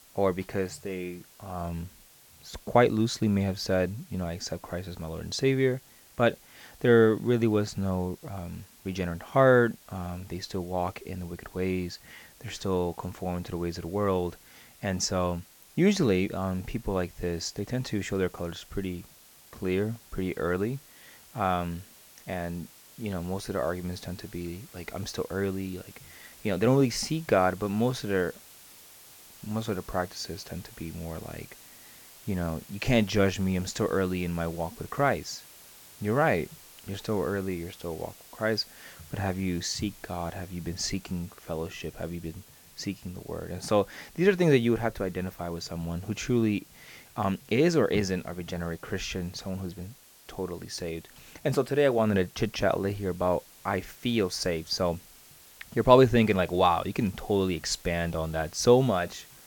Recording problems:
hiss; faint; throughout; 20 dB below the speech

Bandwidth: 17.5 kHz